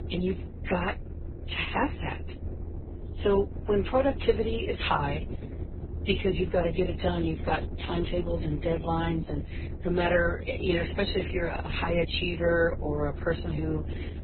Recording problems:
garbled, watery; badly; nothing above 4 kHz
low rumble; noticeable; throughout; 15 dB below the speech

